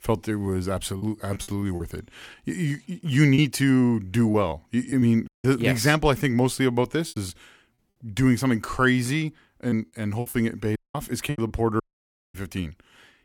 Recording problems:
choppy; very; from 1 to 5 s, at 7 s and from 9.5 to 12 s; 8% of the speech affected
audio cutting out; at 5.5 s, at 11 s and at 12 s for 0.5 s

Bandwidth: 17.5 kHz